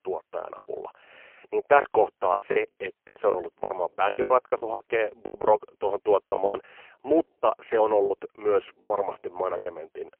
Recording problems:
phone-call audio; poor line; nothing above 3 kHz
choppy; very; 15% of the speech affected

